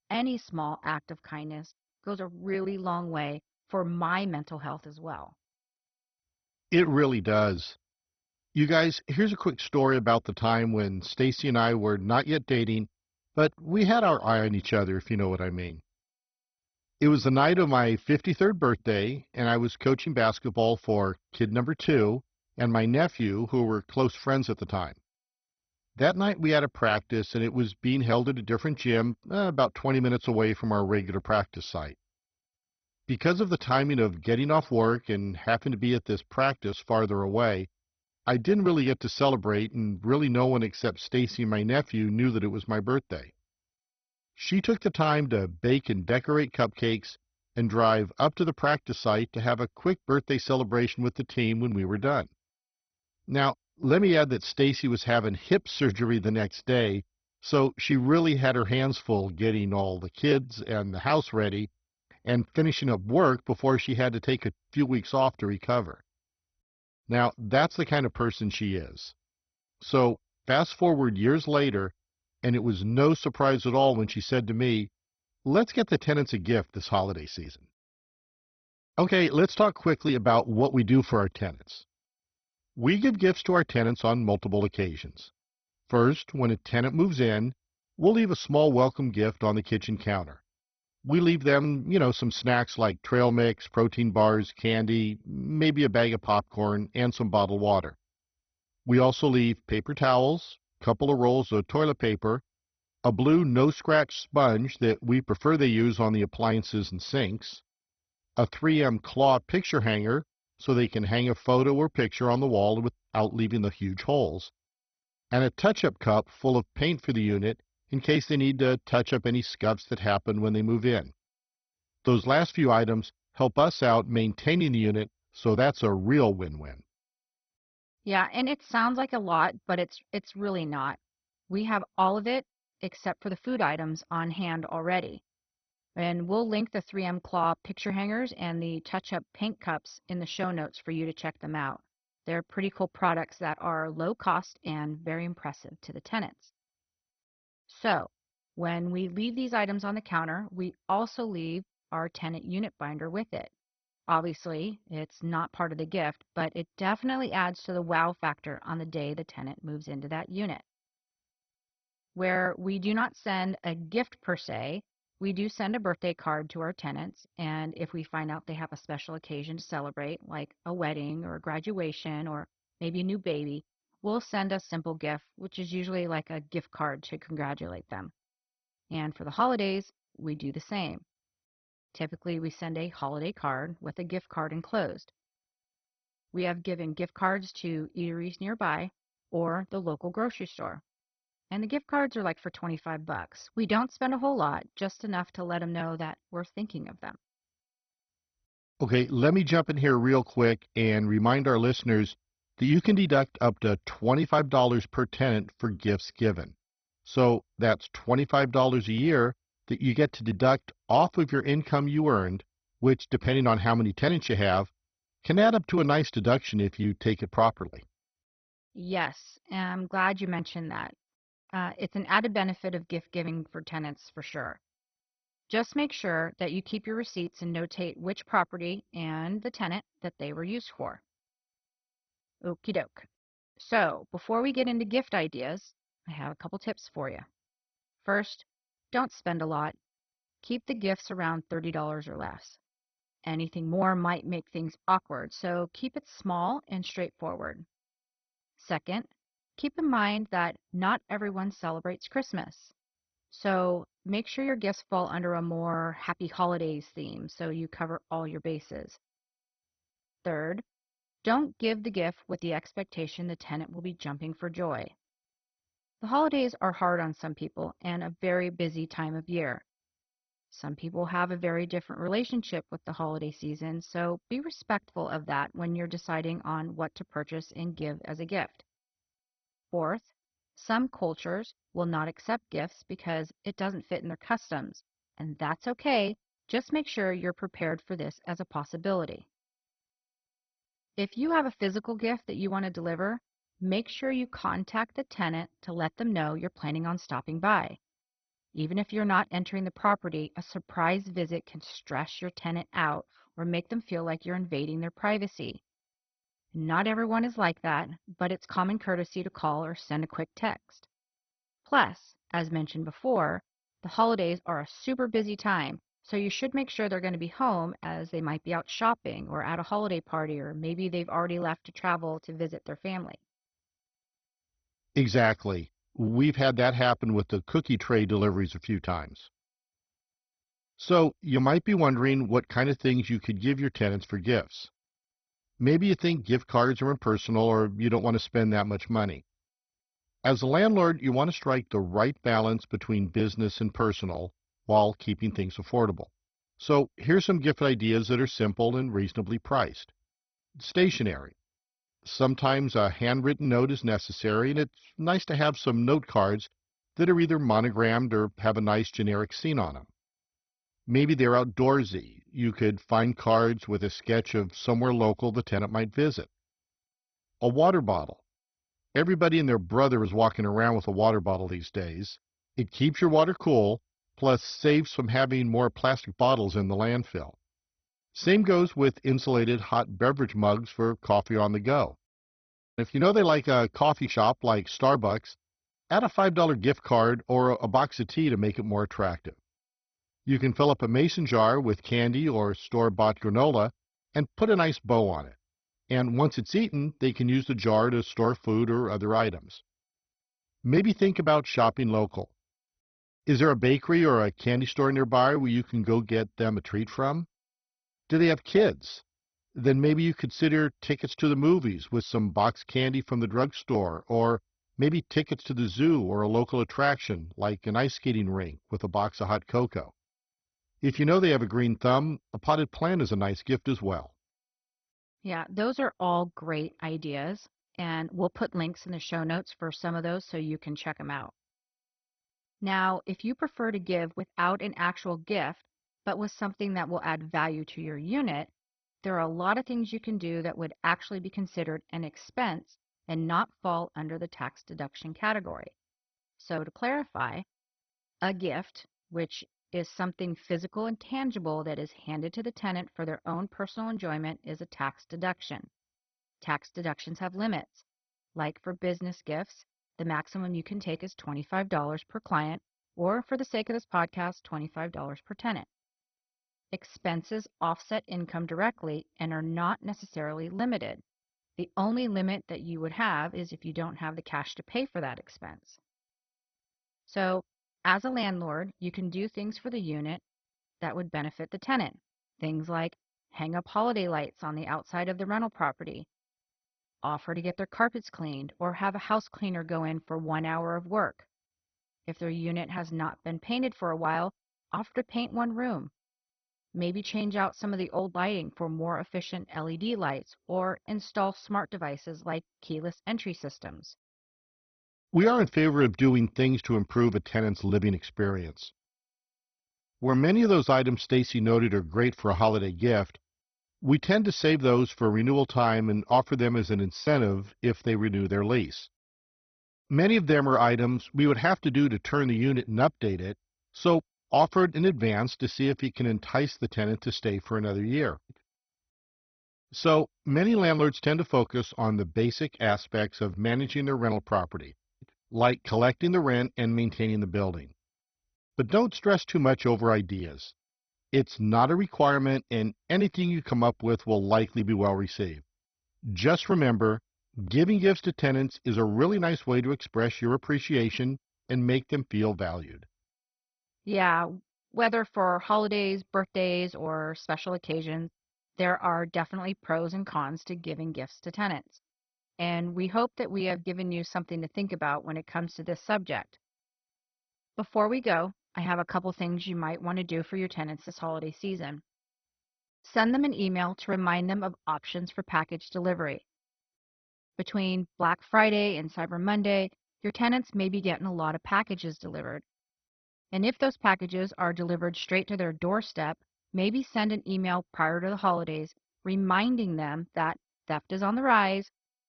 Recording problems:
garbled, watery; badly; nothing above 6 kHz

